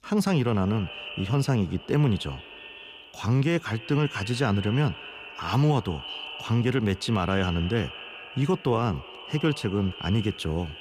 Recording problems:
echo of what is said; noticeable; throughout; 180 ms later, 15 dB below the speech

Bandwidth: 15 kHz